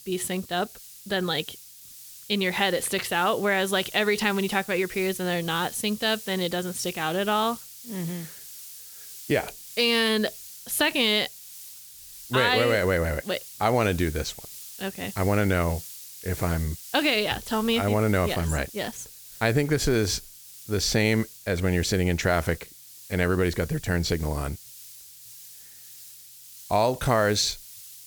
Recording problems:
hiss; noticeable; throughout; 15 dB below the speech

